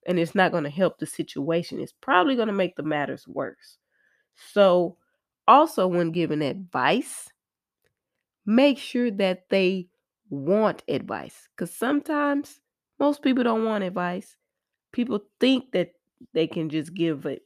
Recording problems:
none

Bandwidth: 14.5 kHz